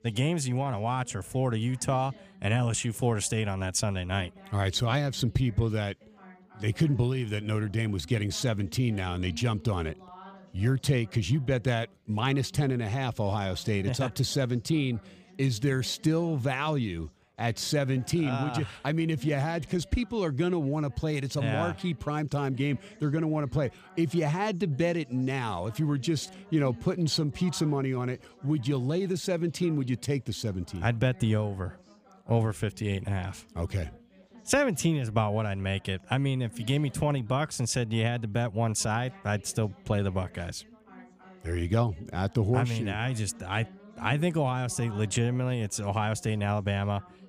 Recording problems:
background chatter; faint; throughout; 4 voices, 25 dB below the speech

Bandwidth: 15 kHz